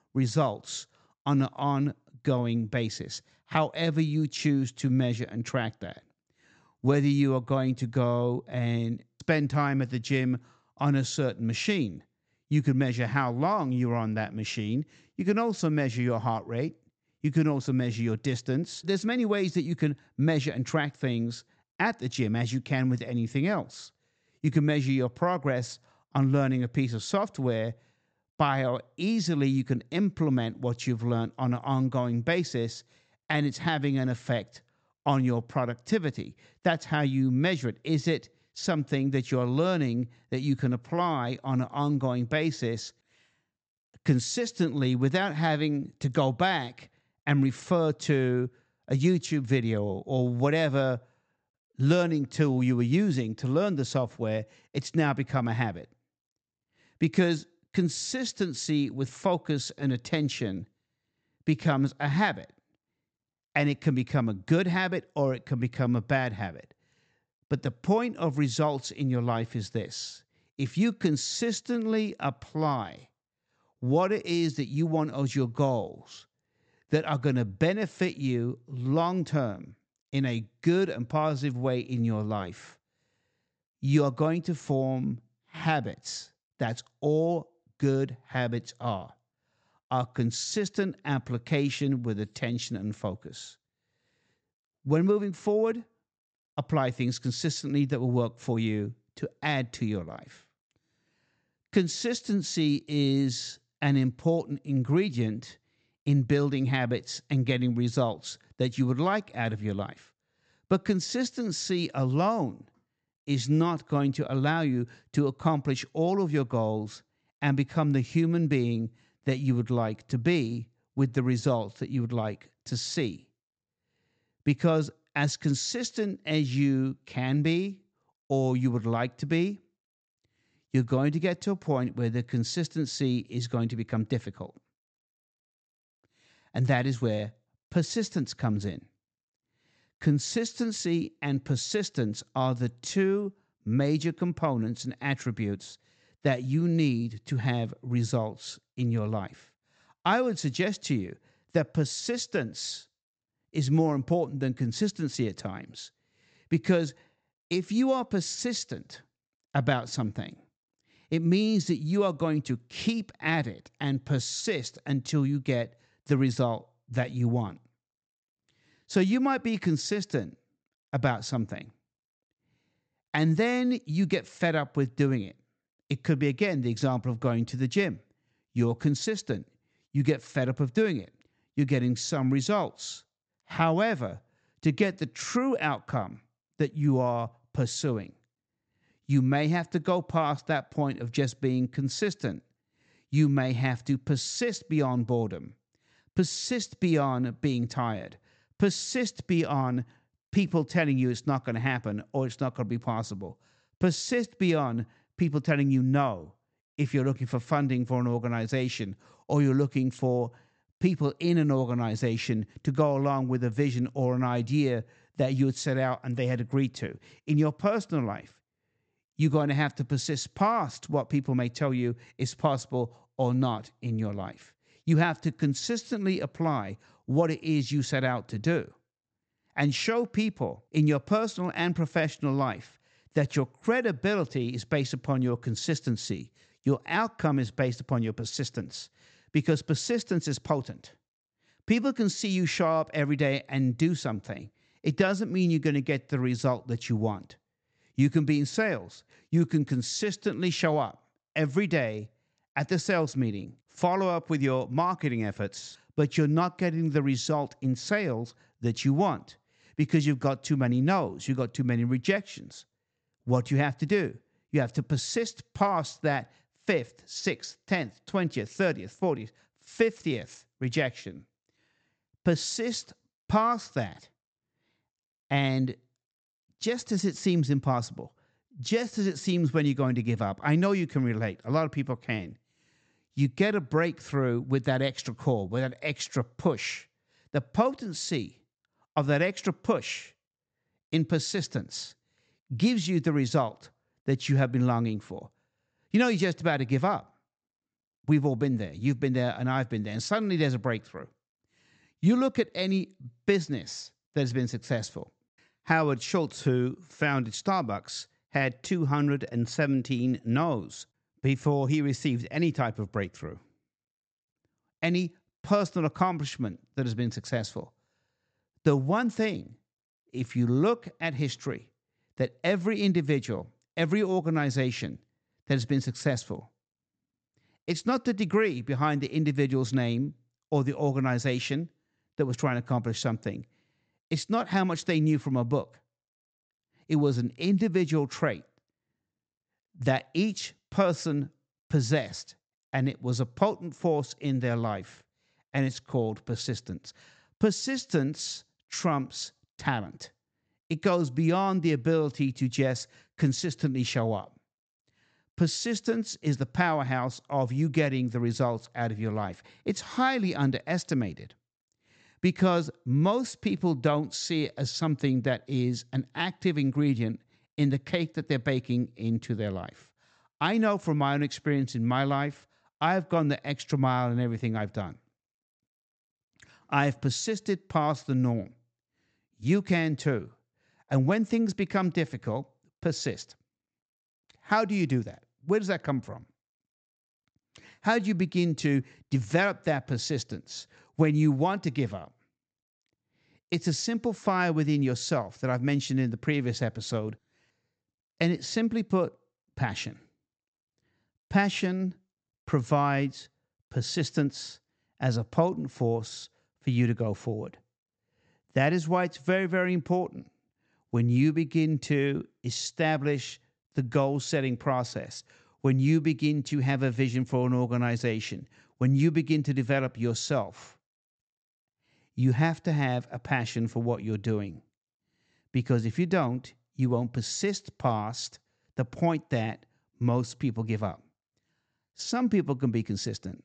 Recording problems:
high frequencies cut off; noticeable; nothing above 8 kHz

